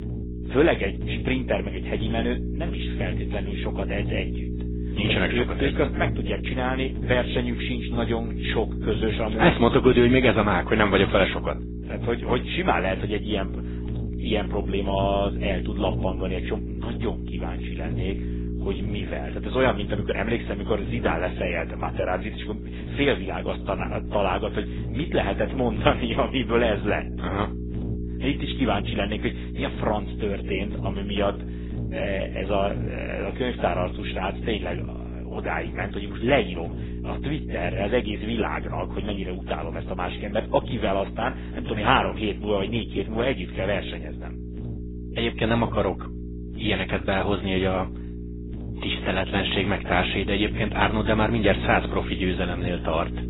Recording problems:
garbled, watery; badly; nothing above 4 kHz
electrical hum; noticeable; throughout; 60 Hz, 15 dB below the speech

